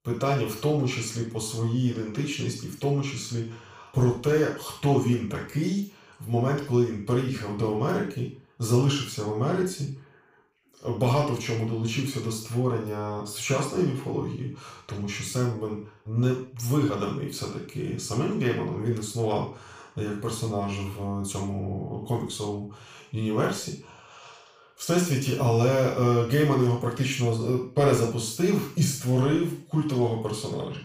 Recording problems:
off-mic speech; far
room echo; noticeable; dies away in 0.4 s

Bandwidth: 15 kHz